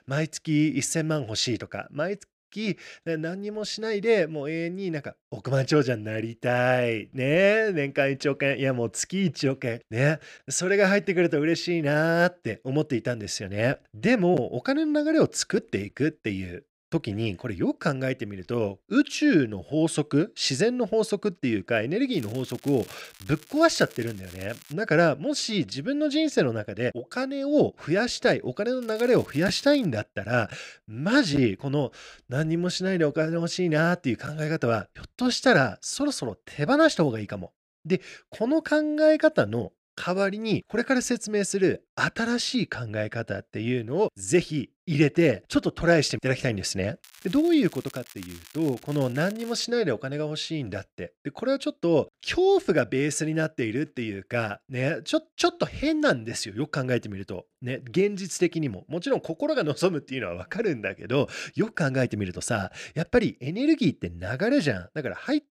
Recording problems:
crackling; faint; from 22 to 25 s, from 29 to 30 s and from 47 to 50 s; 20 dB below the speech

